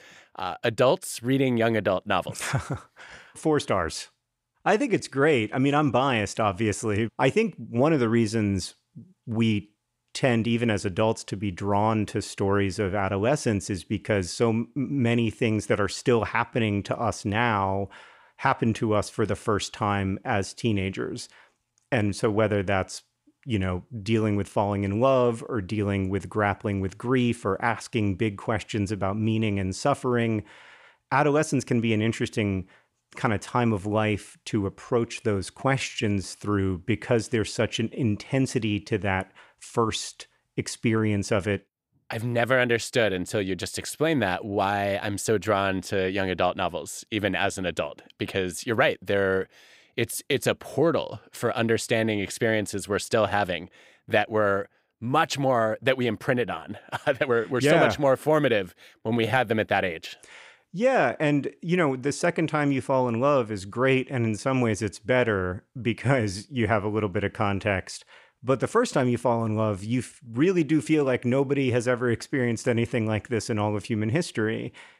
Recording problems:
uneven, jittery; strongly; from 4.5 to 59 s

